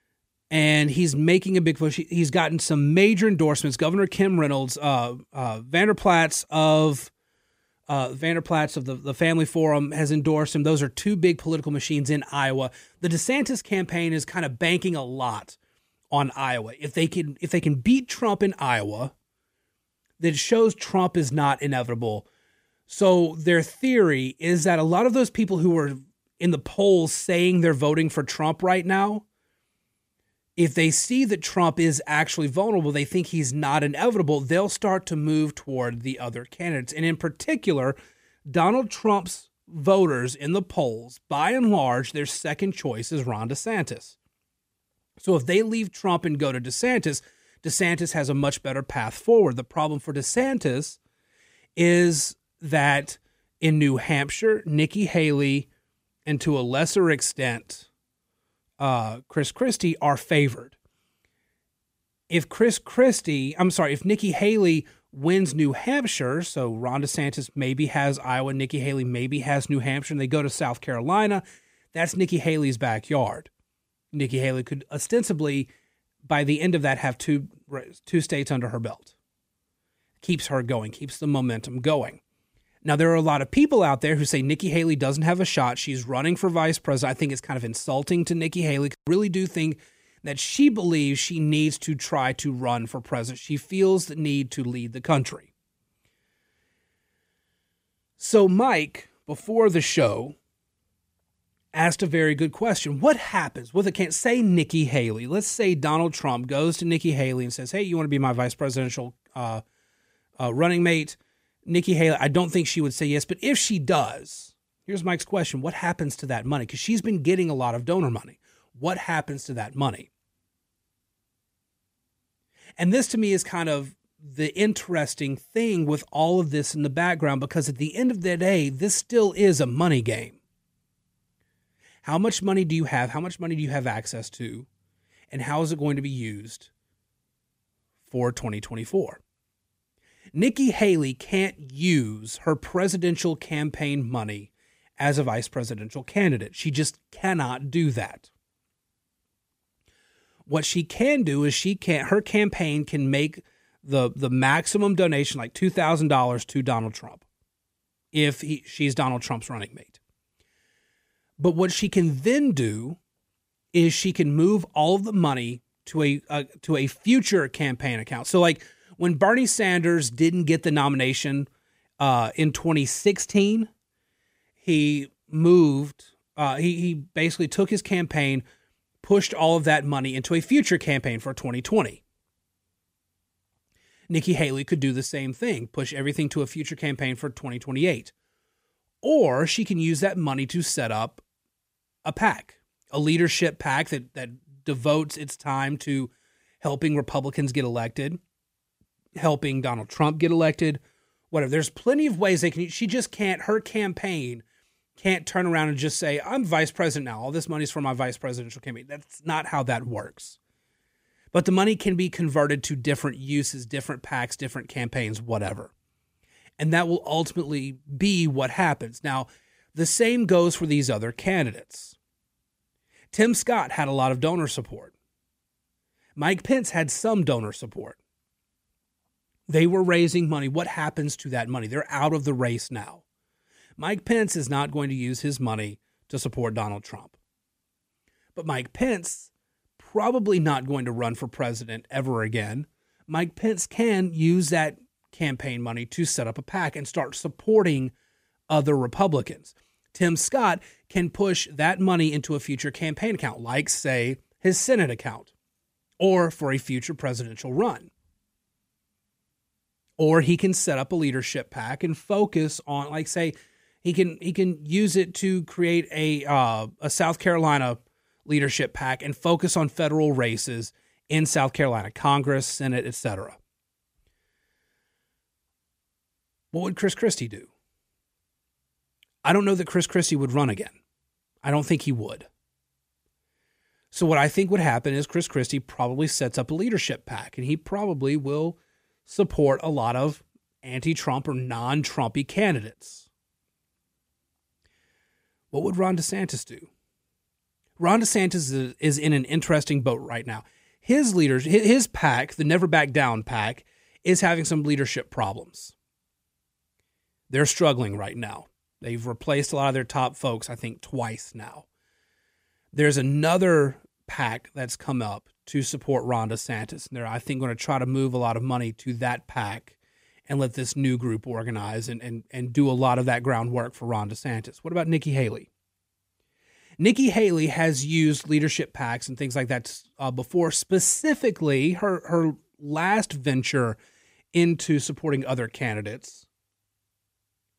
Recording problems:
none

